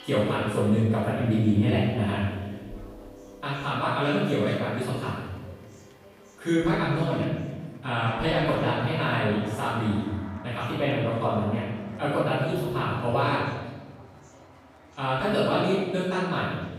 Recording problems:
room echo; strong; dies away in 1.2 s
off-mic speech; far
background music; noticeable; throughout; 20 dB below the speech
chatter from many people; faint; throughout; 25 dB below the speech

